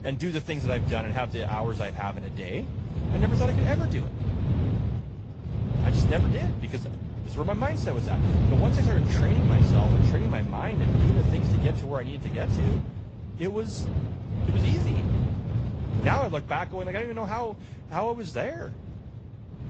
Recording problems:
garbled, watery; slightly; nothing above 8 kHz
wind noise on the microphone; heavy; 3 dB below the speech

